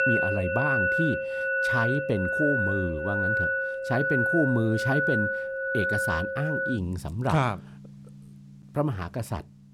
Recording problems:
background music; very loud; throughout; 2 dB above the speech

